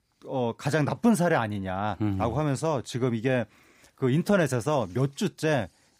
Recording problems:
none

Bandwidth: 15.5 kHz